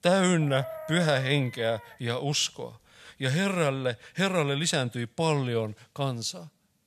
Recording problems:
animal sounds; noticeable; until 4.5 s; 15 dB below the speech

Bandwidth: 14.5 kHz